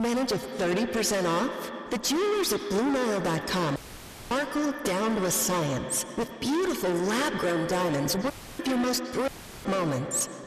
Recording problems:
distortion; heavy; 33% of the sound clipped
echo of what is said; strong; throughout; 110 ms later, 8 dB below the speech
abrupt cut into speech; at the start
audio cutting out; filled with static; at 4 s for 0.5 s, at 8.5 s and at 9.5 s

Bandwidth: 14 kHz